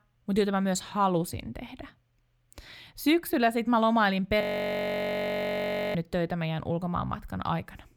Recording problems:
audio freezing; at 4.5 s for 1.5 s

